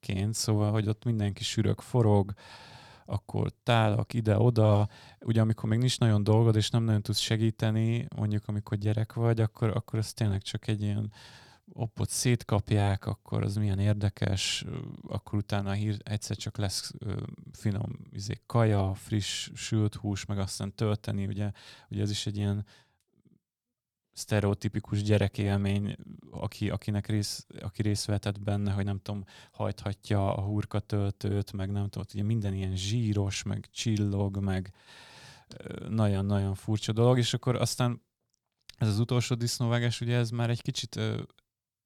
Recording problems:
none

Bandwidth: 18.5 kHz